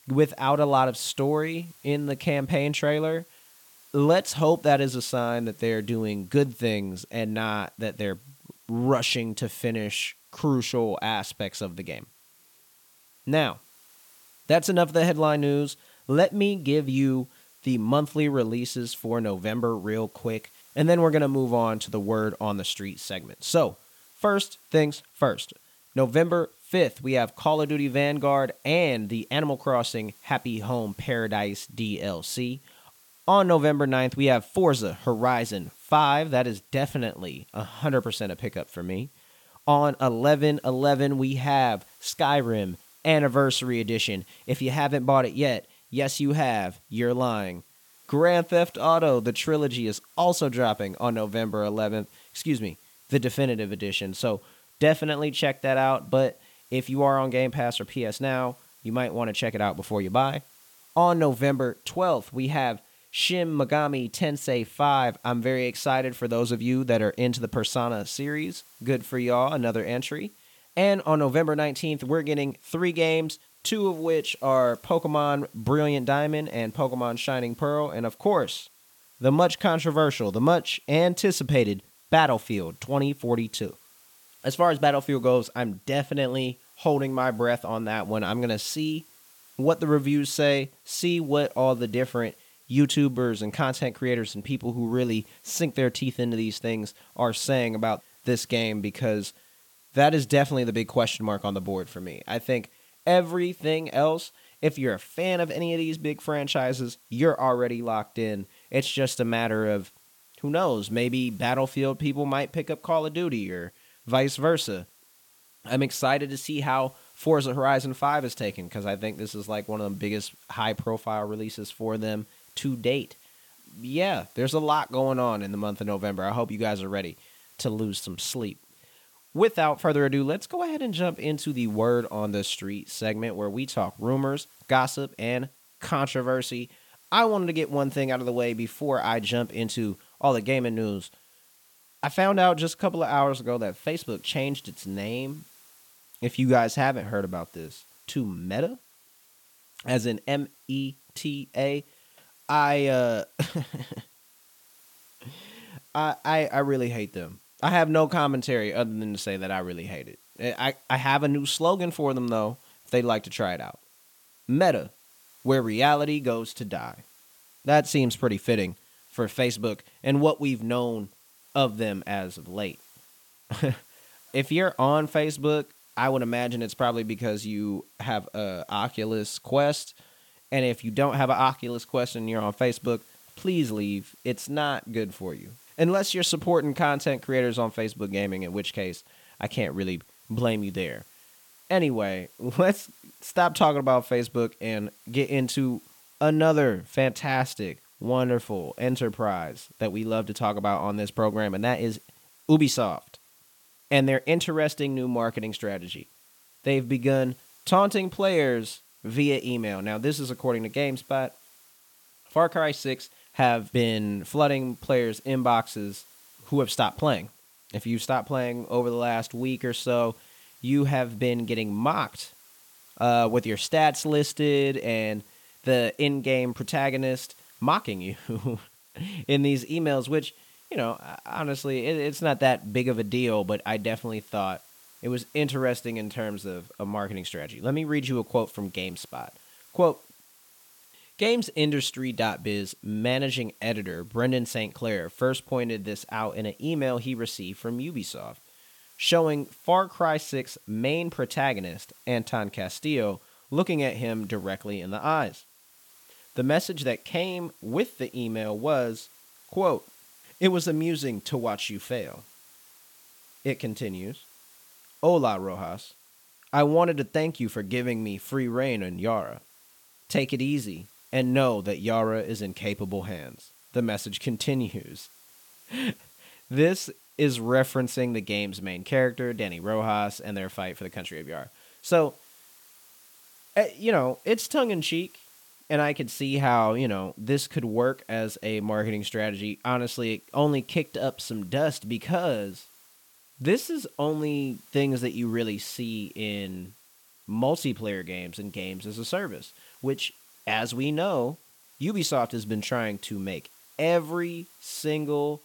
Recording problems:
hiss; faint; throughout; 25 dB below the speech

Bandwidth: 17 kHz